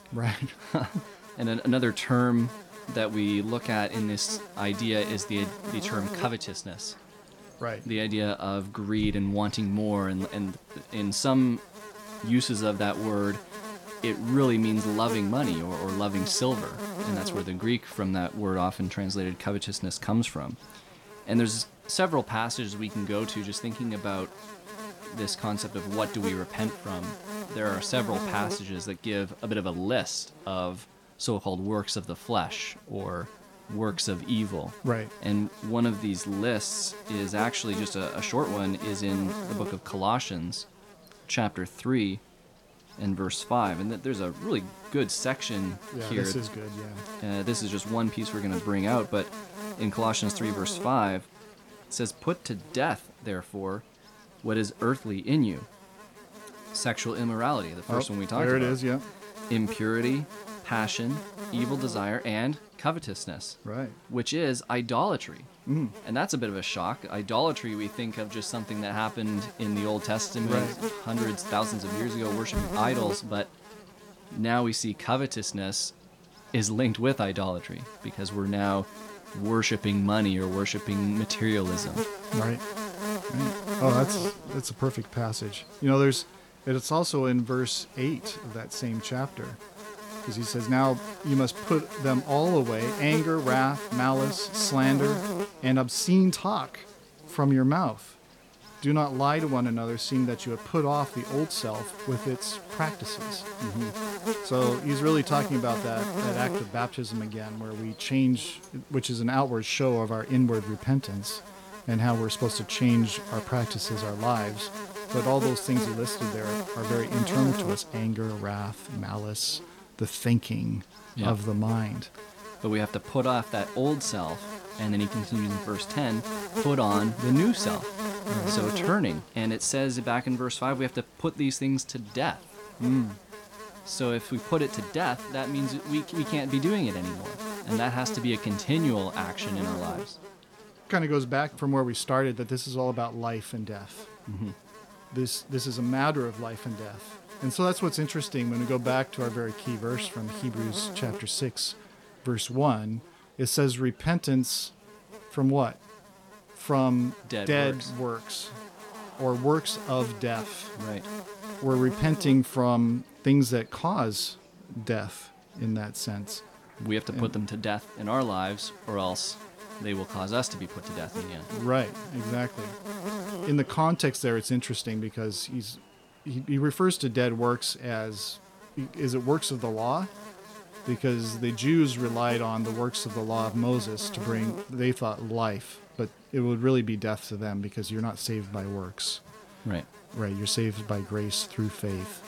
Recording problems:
electrical hum; loud; throughout; 60 Hz, 9 dB below the speech
murmuring crowd; faint; throughout; 30 dB below the speech

